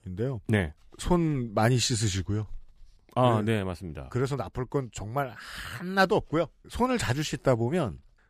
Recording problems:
none

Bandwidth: 15 kHz